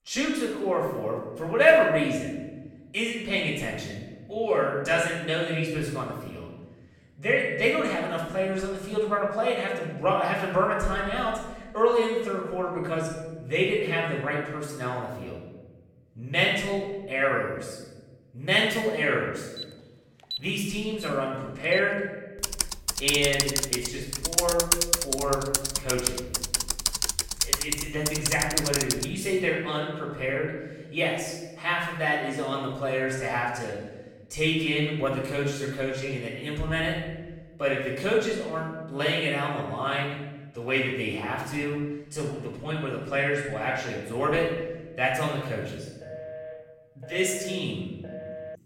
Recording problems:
off-mic speech; far
room echo; noticeable; dies away in 1.1 s
alarm; noticeable; from 20 to 22 s; peak 8 dB below the speech
keyboard typing; loud; from 22 to 29 s; peak 6 dB above the speech
phone ringing; faint; from 46 s on; peak 10 dB below the speech

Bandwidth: 16.5 kHz